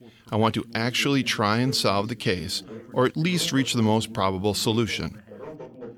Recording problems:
background chatter; noticeable; throughout; 2 voices, 15 dB below the speech

